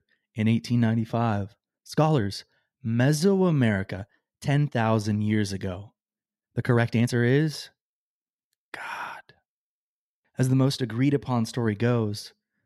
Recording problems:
uneven, jittery; strongly; from 1.5 to 11 s

